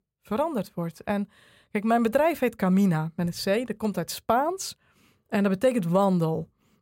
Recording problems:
none

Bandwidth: 16 kHz